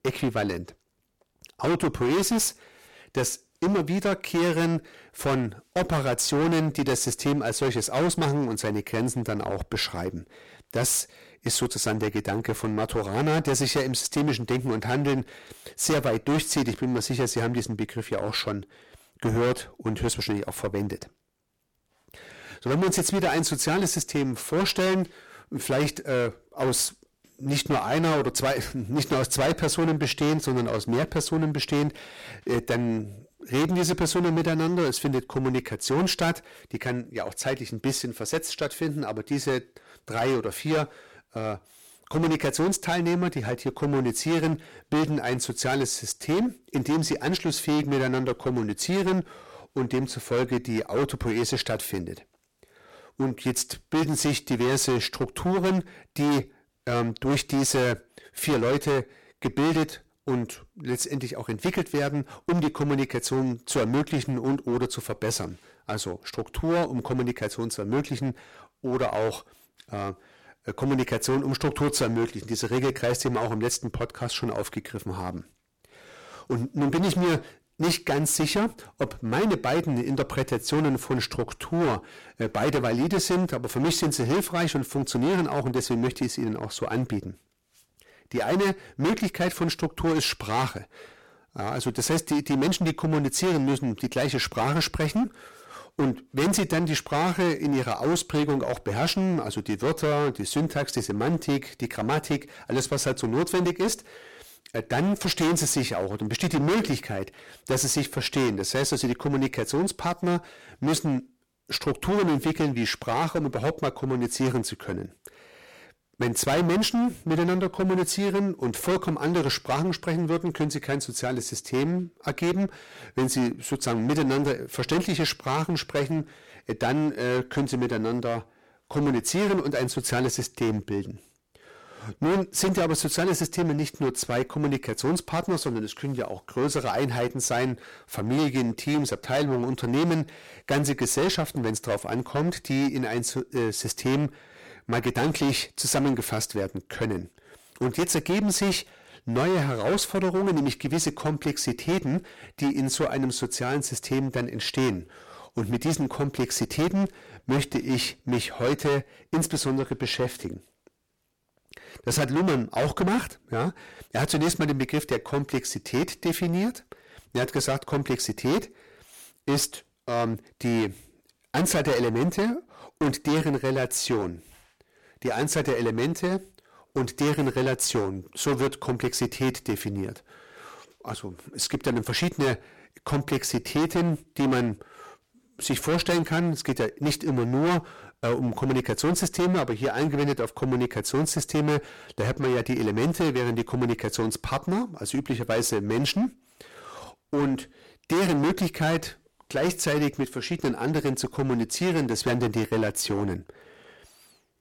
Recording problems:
distortion; heavy; 15% of the sound clipped

